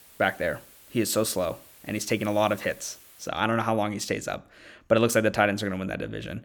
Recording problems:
hiss; faint; until 3.5 s; 25 dB below the speech

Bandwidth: 18.5 kHz